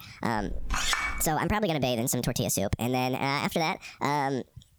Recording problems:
squashed, flat; heavily
wrong speed and pitch; too fast and too high; 1.5 times normal speed
clattering dishes; loud; at 0.5 s; peak 2 dB above the speech

